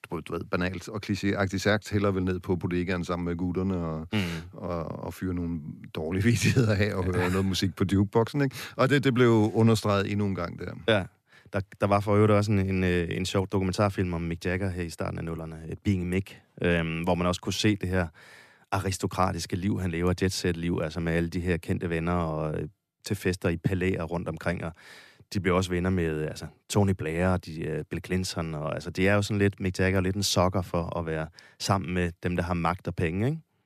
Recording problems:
none

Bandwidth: 14.5 kHz